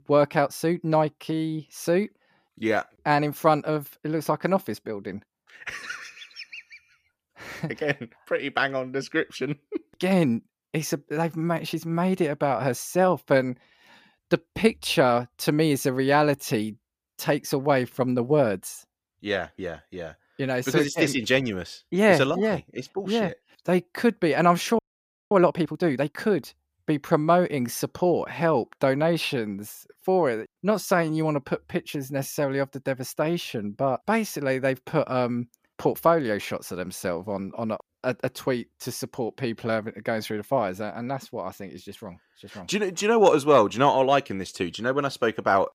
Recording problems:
audio freezing; at 25 s for 0.5 s

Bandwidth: 15 kHz